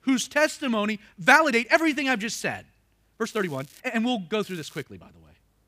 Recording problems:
crackling; faint; at 3.5 s and at 4.5 s; 25 dB below the speech
uneven, jittery; strongly; from 1 to 5 s

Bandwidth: 15 kHz